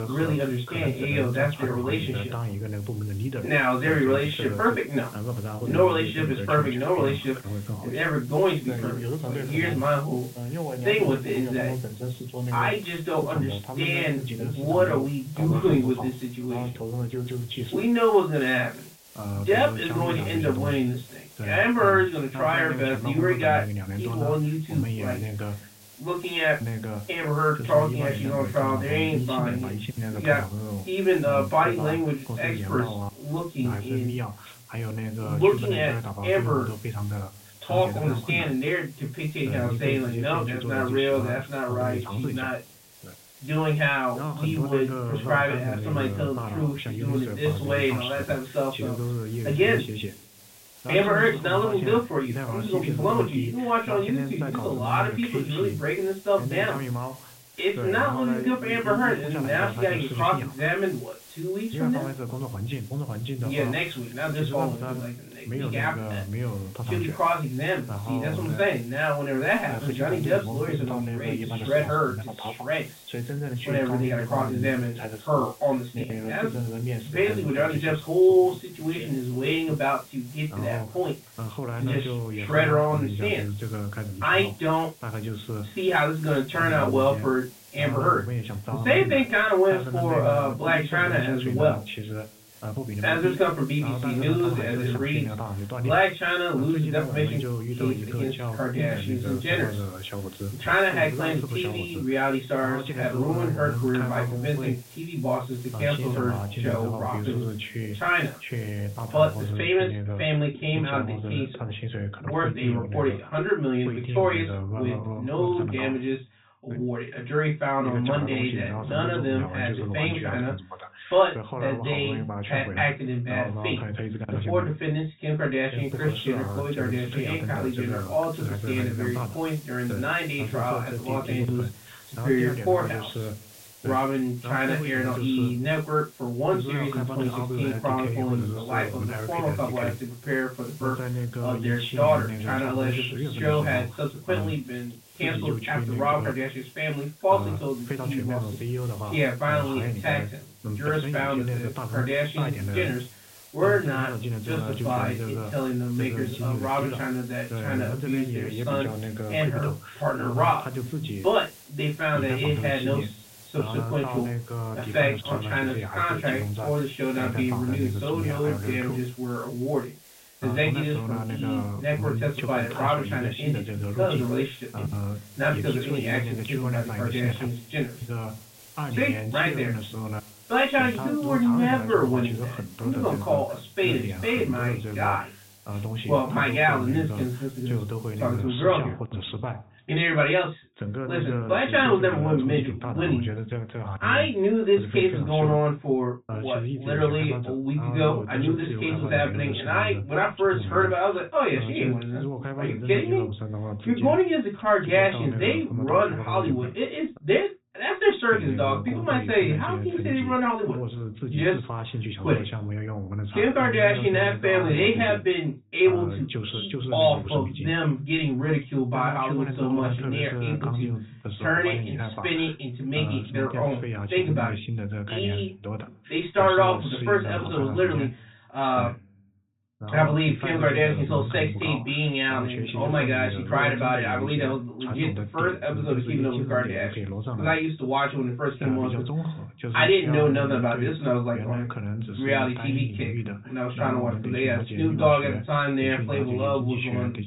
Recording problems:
off-mic speech; far
high frequencies cut off; severe; nothing above 4 kHz
room echo; slight; dies away in 0.2 s
voice in the background; loud; throughout; 7 dB below the speech
hiss; faint; until 1:50 and from 2:06 to 3:08; 20 dB below the speech

